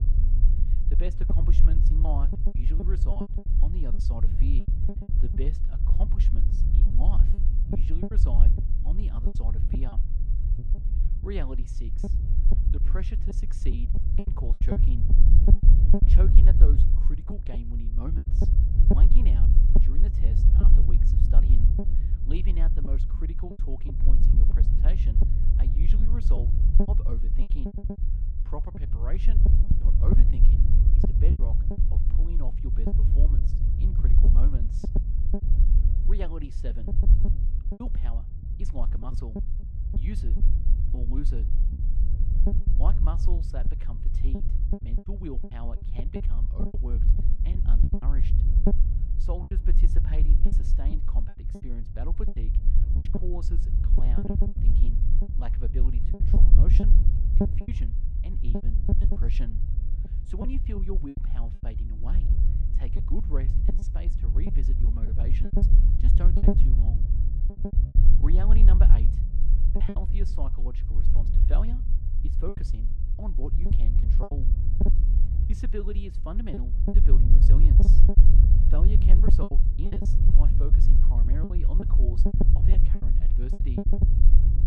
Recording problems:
muffled; slightly; fading above 3.5 kHz
low rumble; very loud; throughout; 2 dB above the speech
choppy; very; 8% of the speech affected

